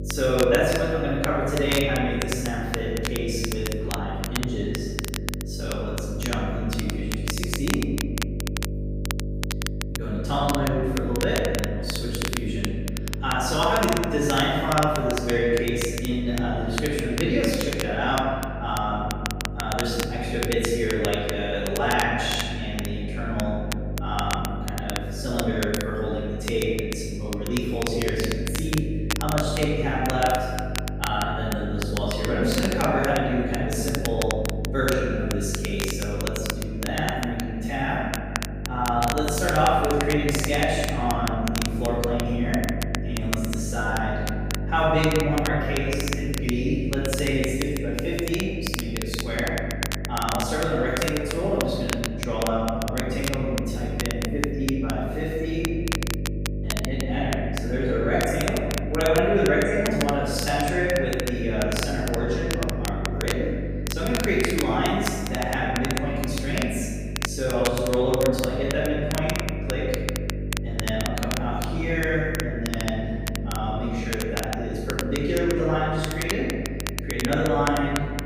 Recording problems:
room echo; strong; dies away in 1.8 s
off-mic speech; far
crackle, like an old record; loud; 8 dB below the speech
electrical hum; noticeable; throughout; 50 Hz, 15 dB below the speech

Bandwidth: 15 kHz